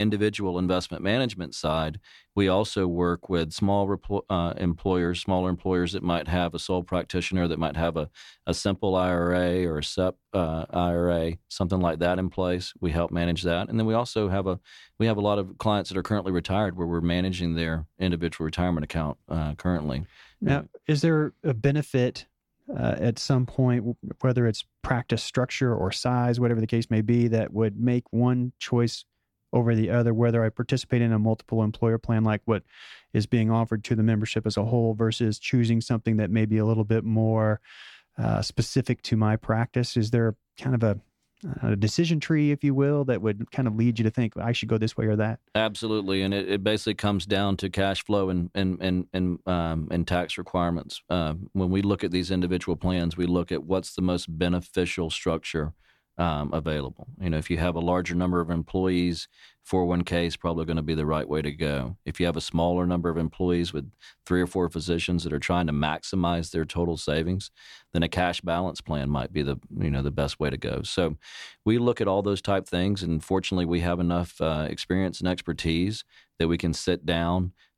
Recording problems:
abrupt cut into speech; at the start

